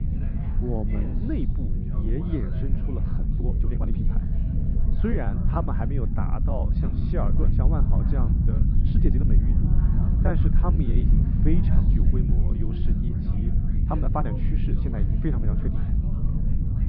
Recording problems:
muffled; very; fading above 1.5 kHz
high frequencies cut off; noticeable; nothing above 5.5 kHz
low rumble; loud; throughout; 2 dB below the speech
chatter from many people; noticeable; throughout; 10 dB below the speech
uneven, jittery; strongly; from 3 to 14 s

